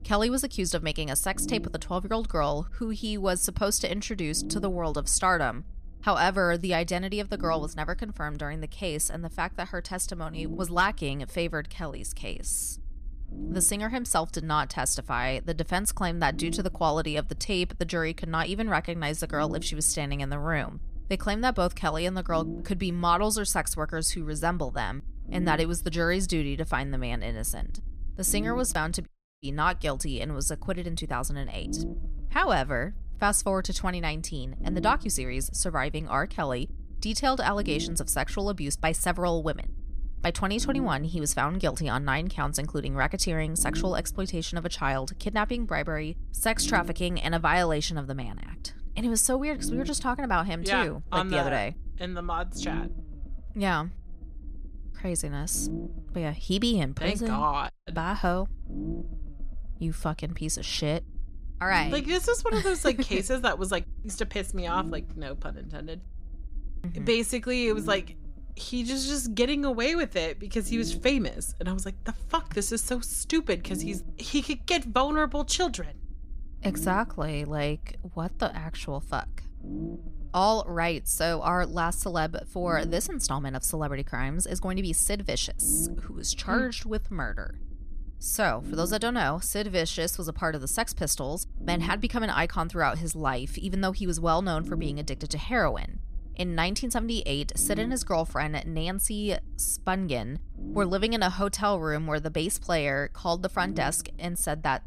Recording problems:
low rumble; noticeable; throughout; 20 dB below the speech
audio cutting out; at 29 s and at 58 s

